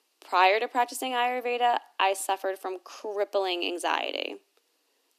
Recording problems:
thin; somewhat; fading below 250 Hz

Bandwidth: 14.5 kHz